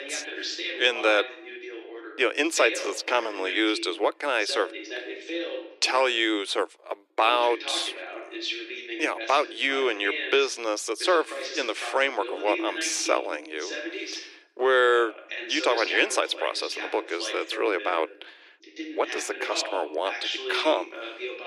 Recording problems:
thin; very; fading below 300 Hz
voice in the background; loud; throughout; 9 dB below the speech

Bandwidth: 13.5 kHz